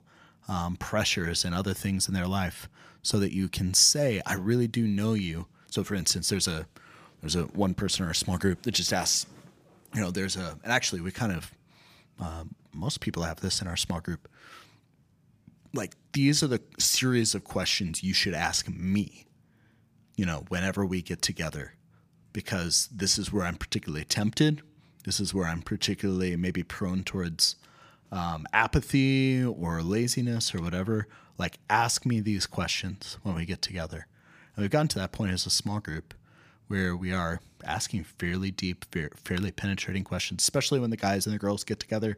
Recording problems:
none

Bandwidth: 15 kHz